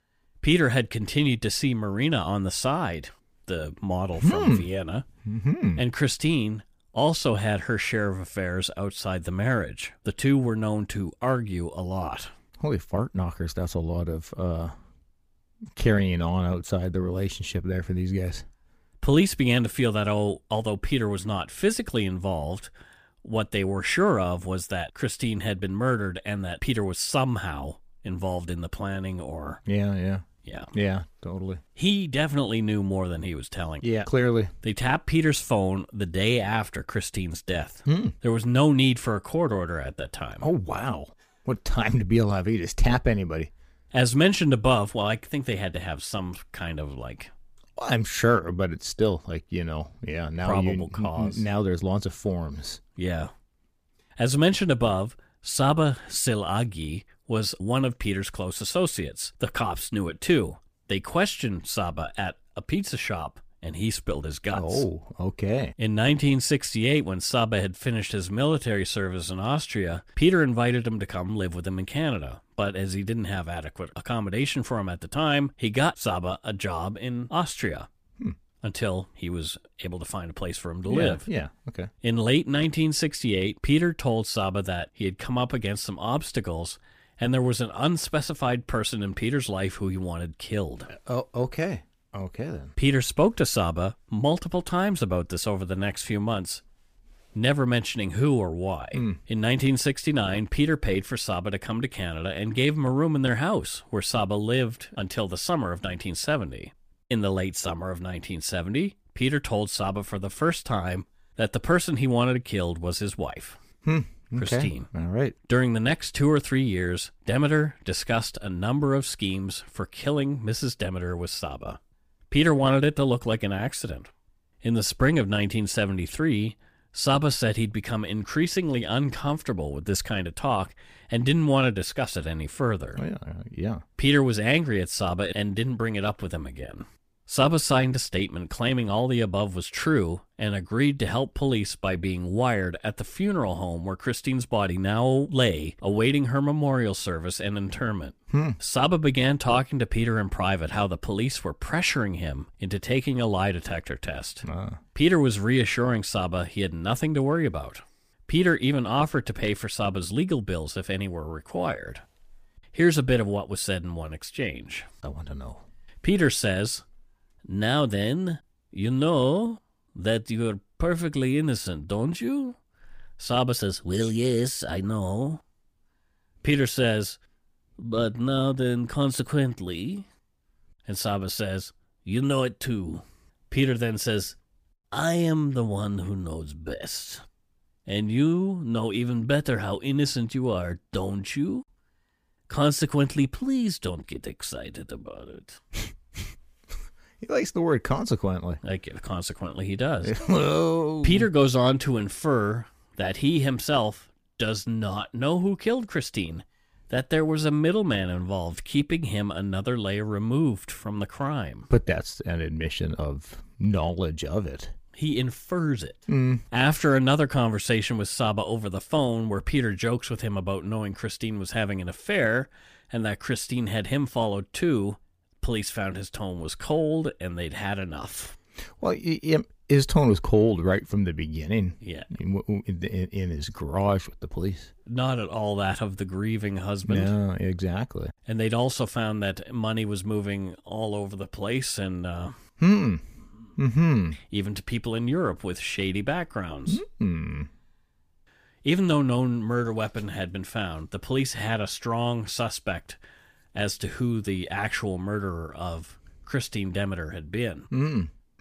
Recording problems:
none

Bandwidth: 15 kHz